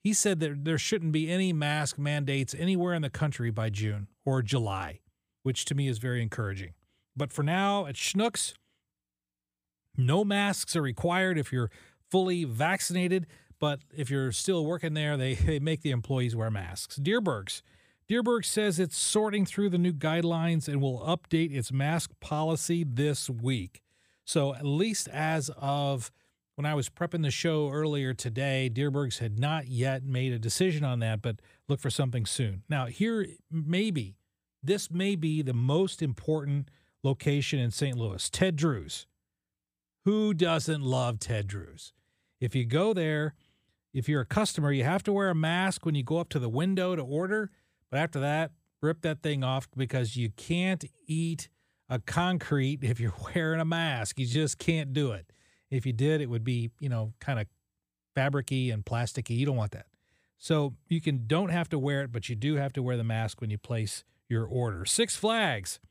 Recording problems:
none

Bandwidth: 15 kHz